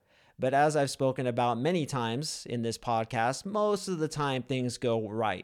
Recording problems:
none

